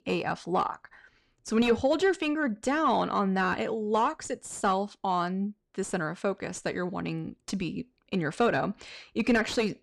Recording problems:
distortion; slight; 10 dB below the speech

